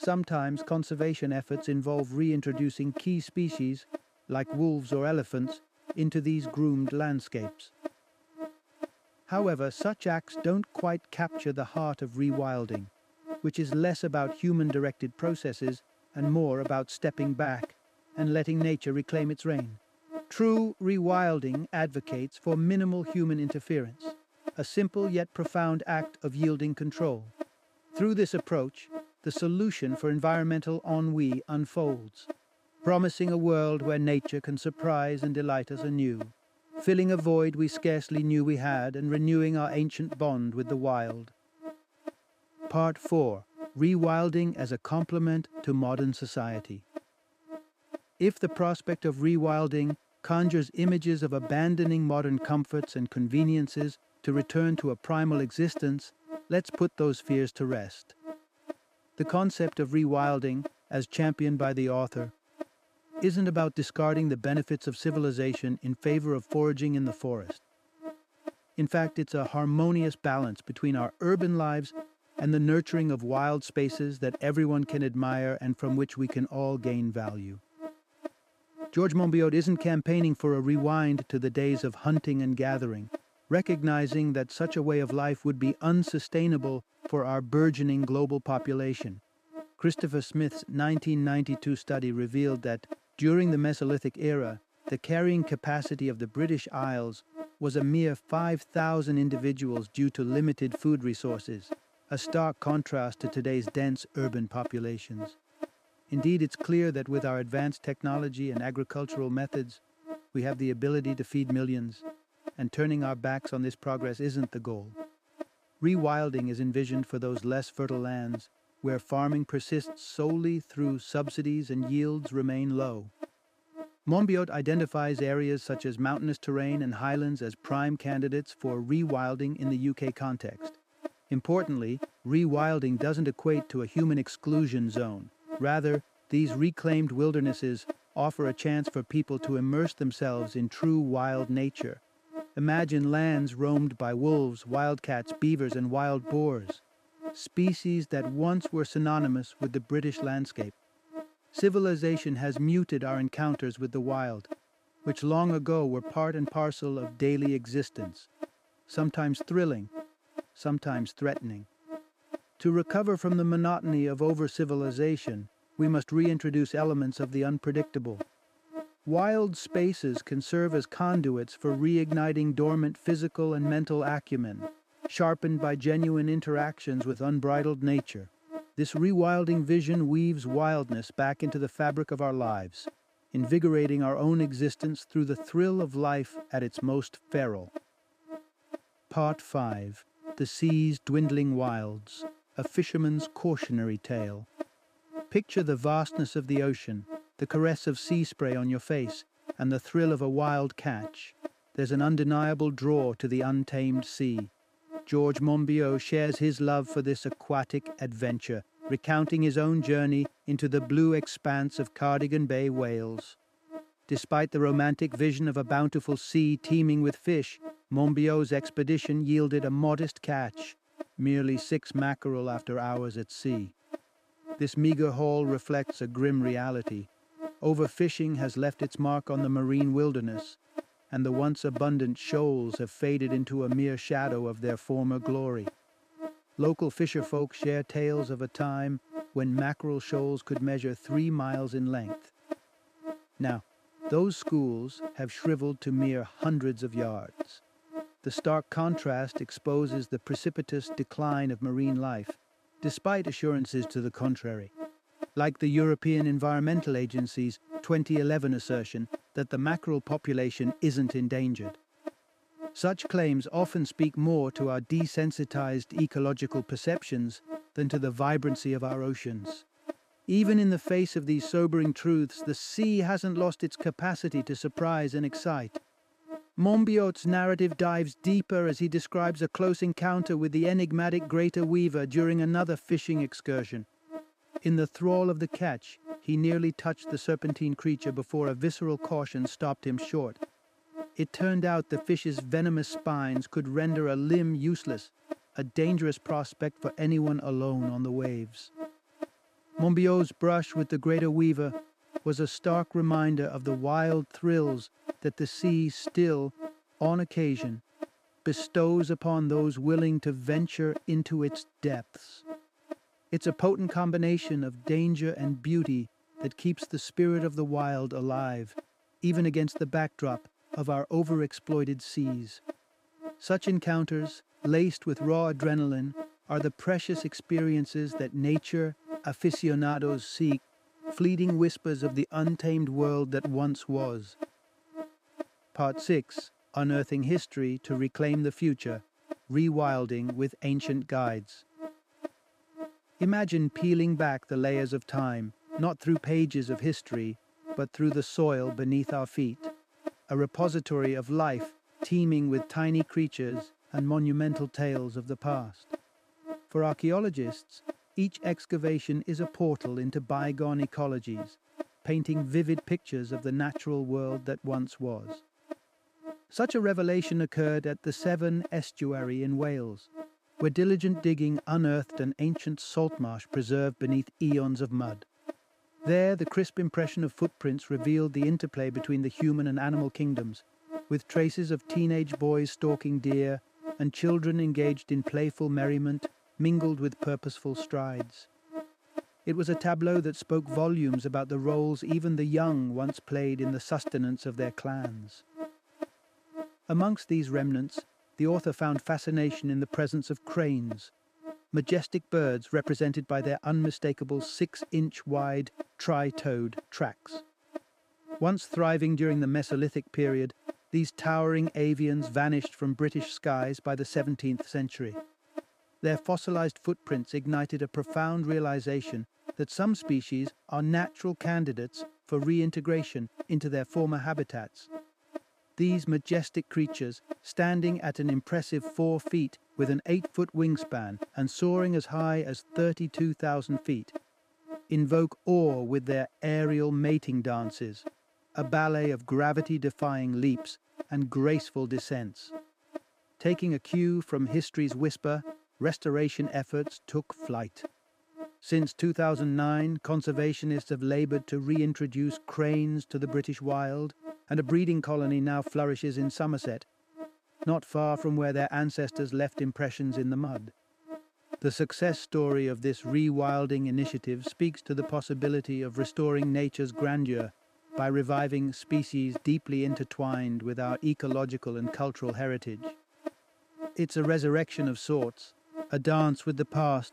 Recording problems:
electrical hum; noticeable; throughout; 60 Hz, 15 dB below the speech

